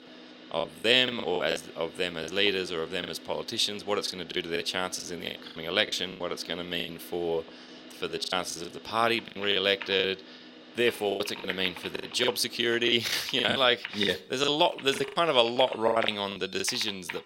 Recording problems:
thin; somewhat; fading below 300 Hz
household noises; noticeable; throughout; 15 dB below the speech
traffic noise; faint; throughout; 20 dB below the speech
choppy; very; 13% of the speech affected

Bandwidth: 16 kHz